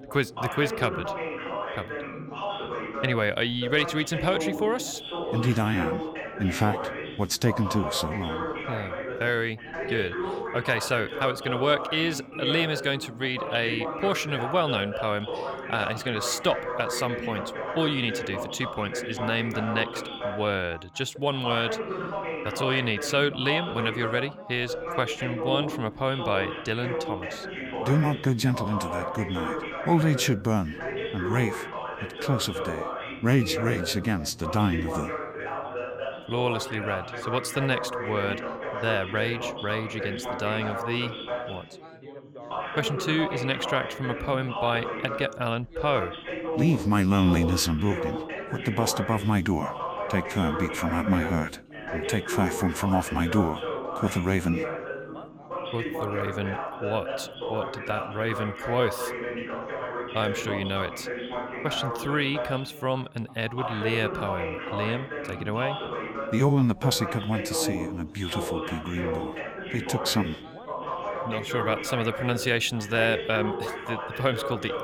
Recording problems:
background chatter; loud; throughout; 4 voices, 5 dB below the speech

